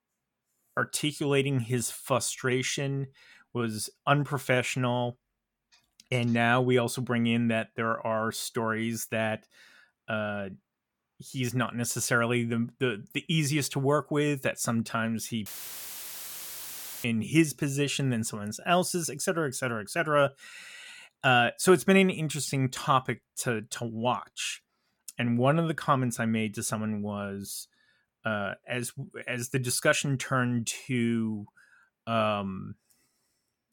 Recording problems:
audio cutting out; filled with static; at 15 s for 1.5 s

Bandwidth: 17.5 kHz